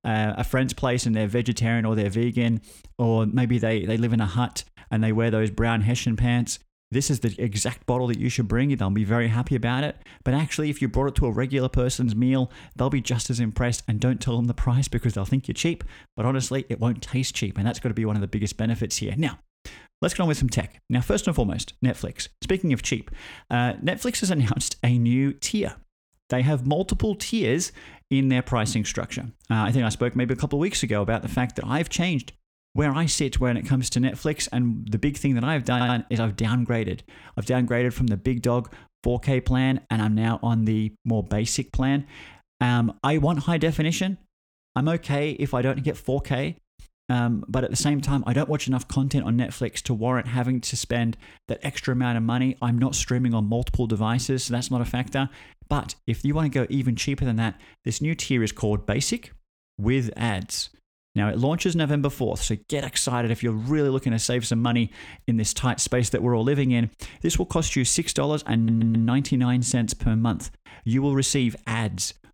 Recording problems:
audio stuttering; at 36 s and at 1:09

